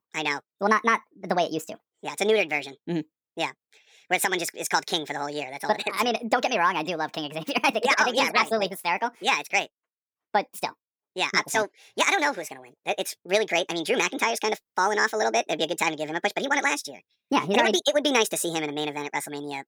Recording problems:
wrong speed and pitch; too fast and too high; 1.6 times normal speed

